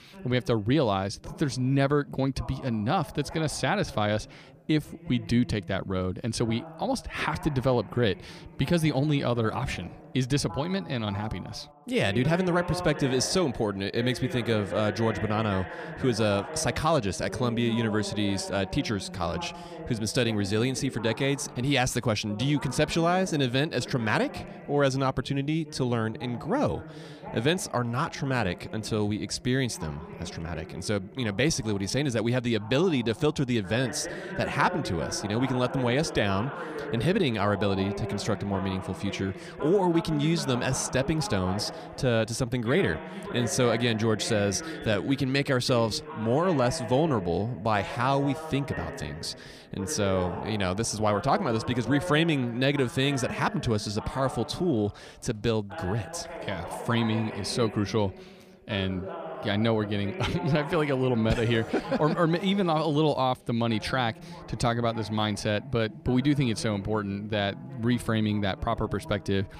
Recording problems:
voice in the background; noticeable; throughout; 10 dB below the speech

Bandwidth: 15 kHz